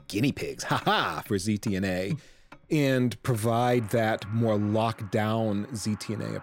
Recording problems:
traffic noise; faint; throughout; 25 dB below the speech

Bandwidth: 16 kHz